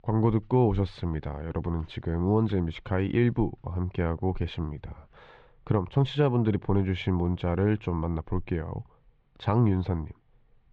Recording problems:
muffled; slightly; fading above 3.5 kHz

